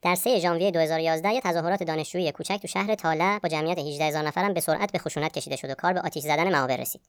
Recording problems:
wrong speed and pitch; too fast and too high; 1.5 times normal speed

